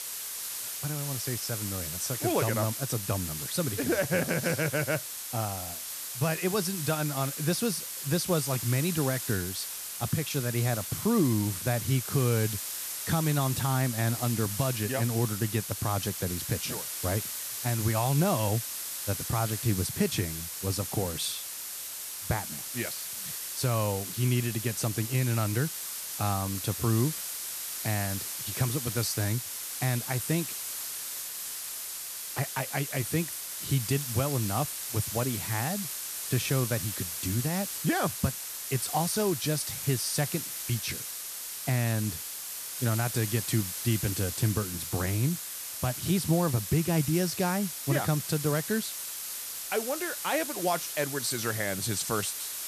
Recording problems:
hiss; loud; throughout; 4 dB below the speech

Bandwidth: 14 kHz